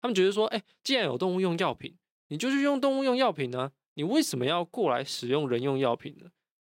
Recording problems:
none

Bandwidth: 16 kHz